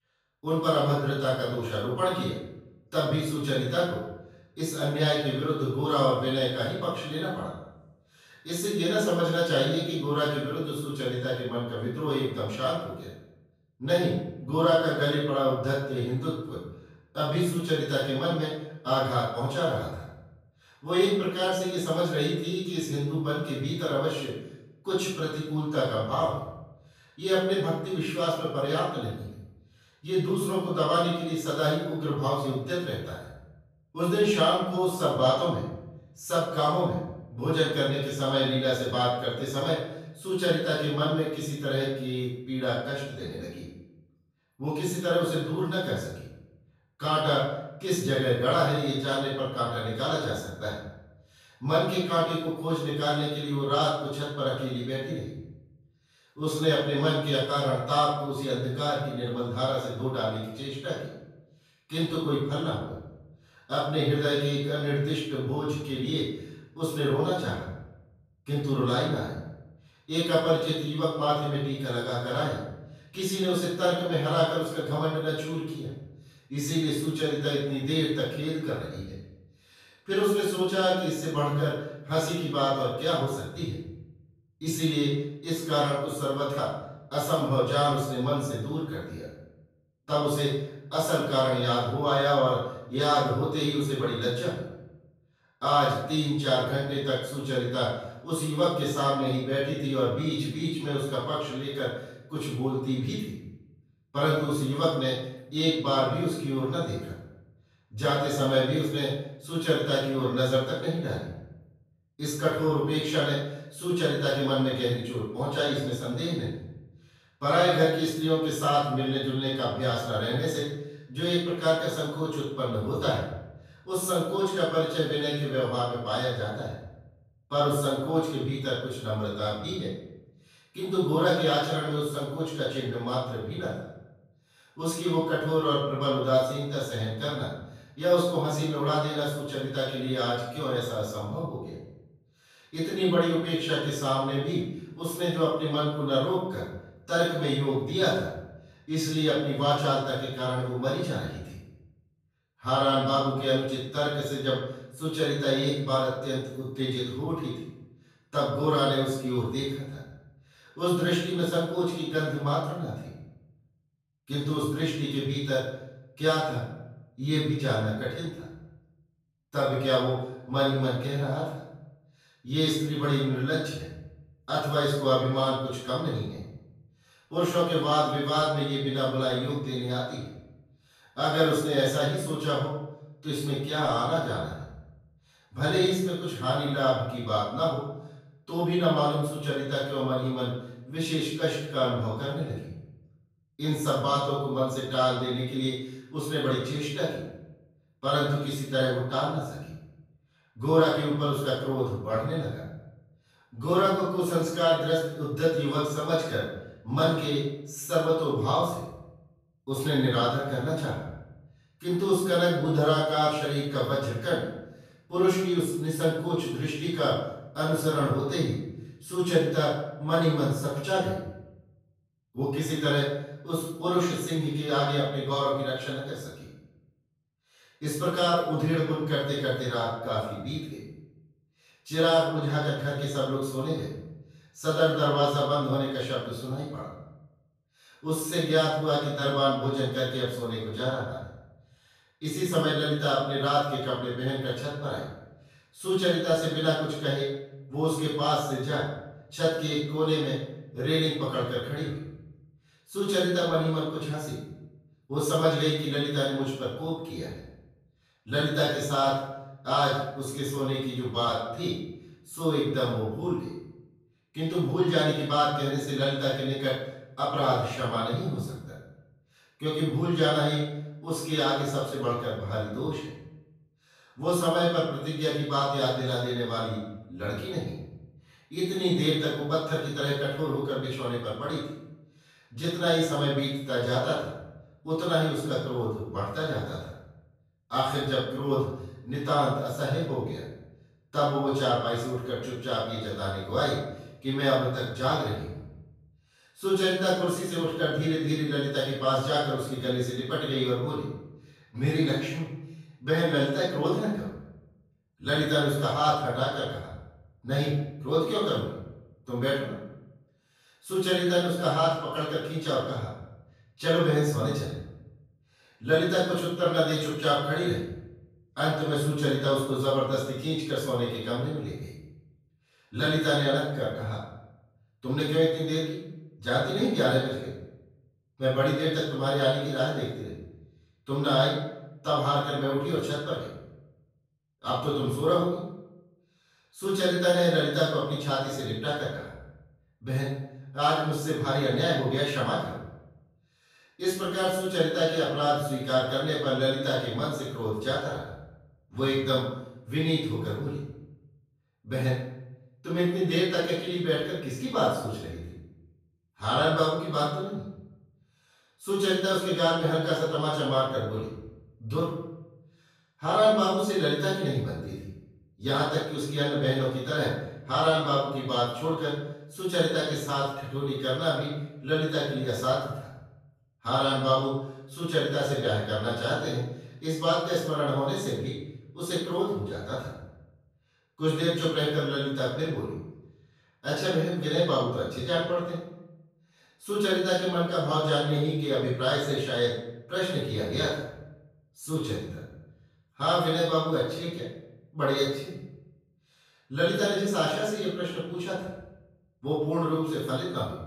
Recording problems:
room echo; strong; dies away in 0.7 s
off-mic speech; far

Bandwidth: 14.5 kHz